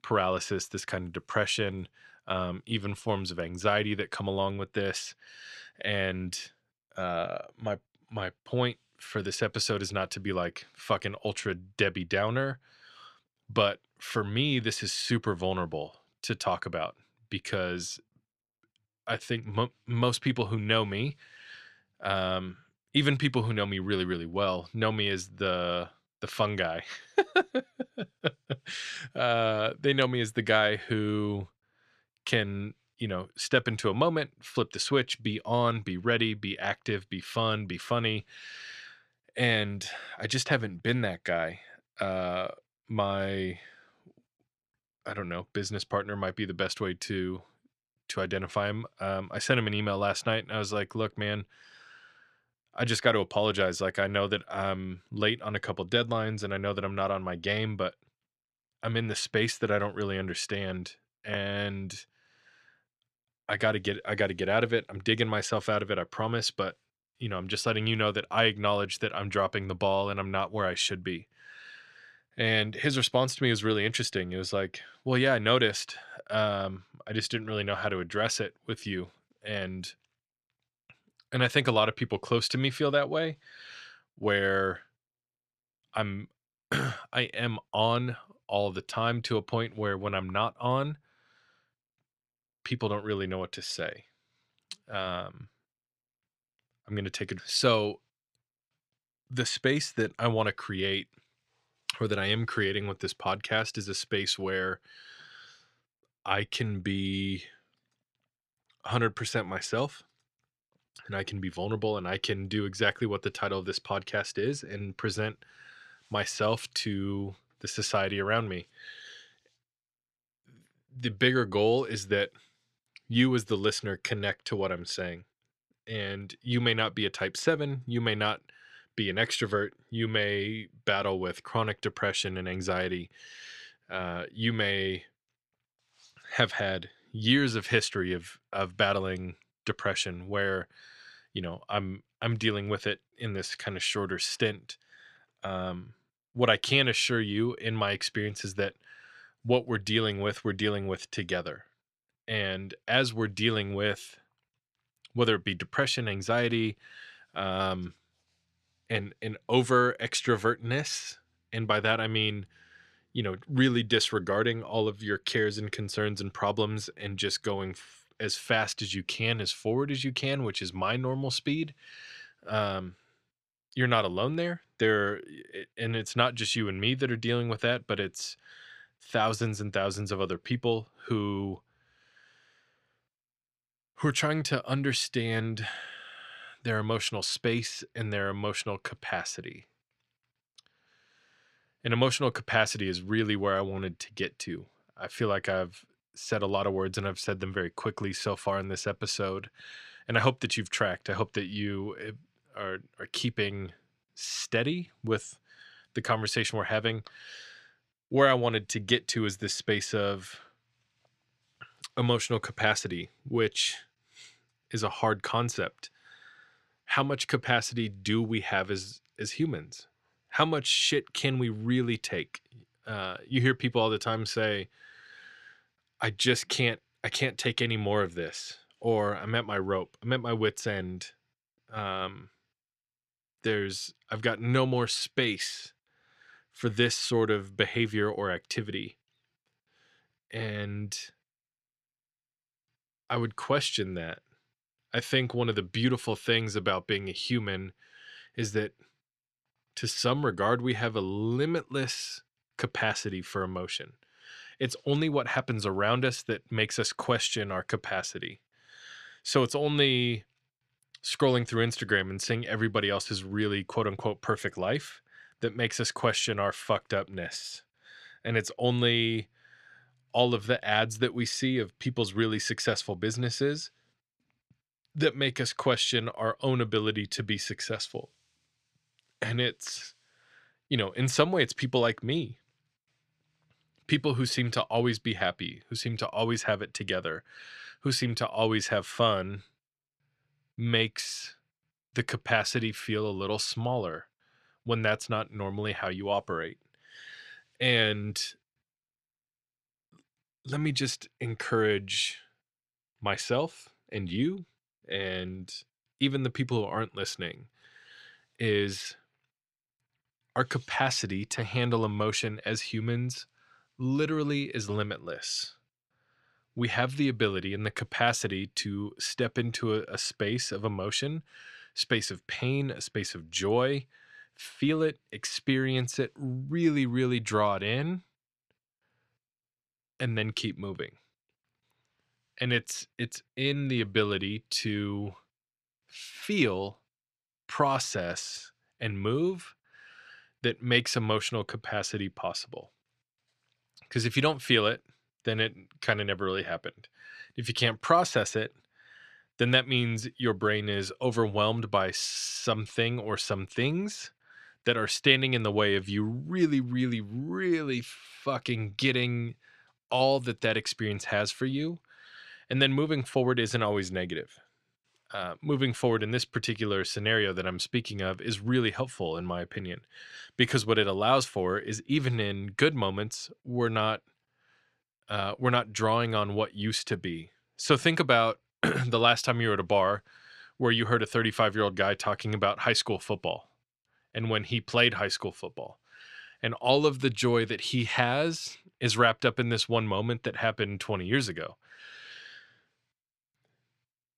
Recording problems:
none

